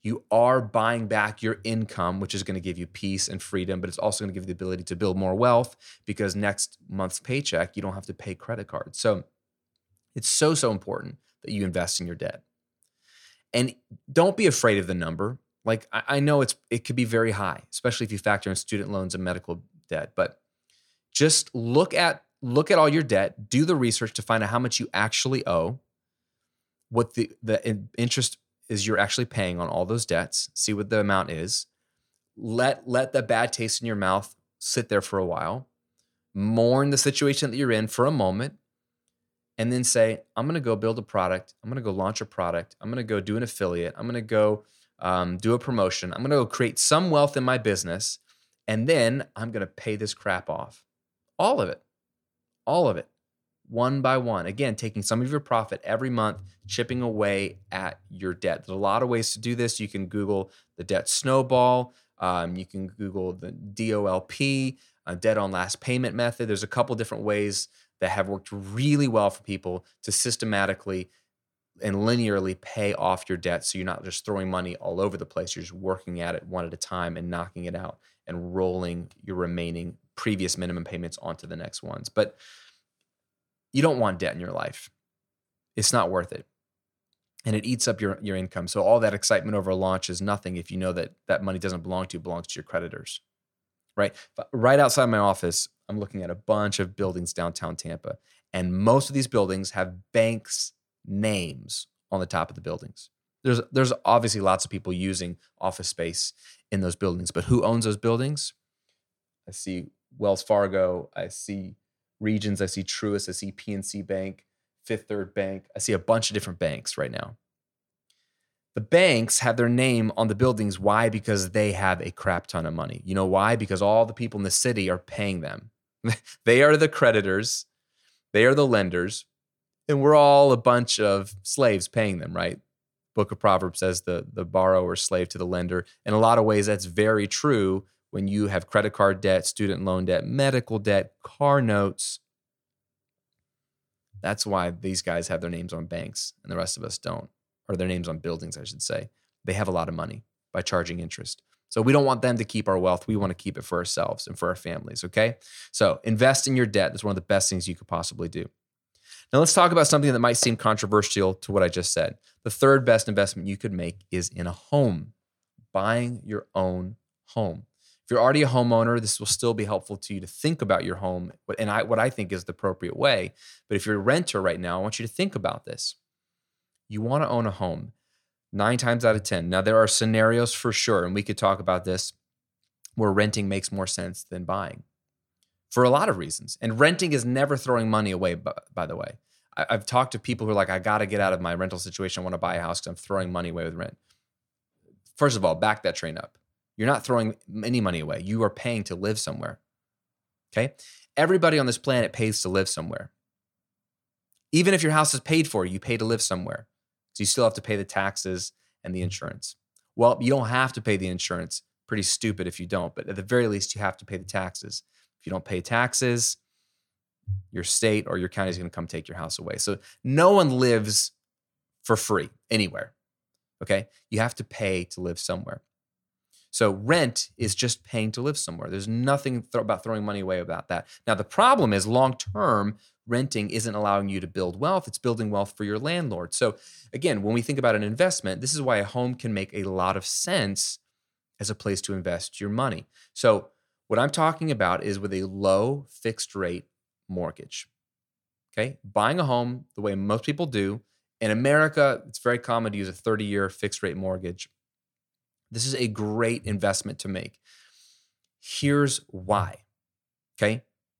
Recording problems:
none

